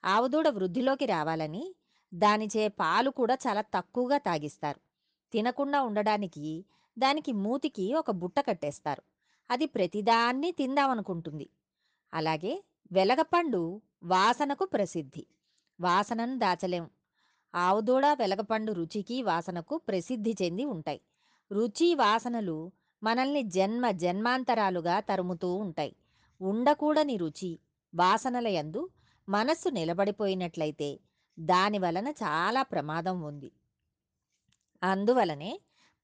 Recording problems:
none

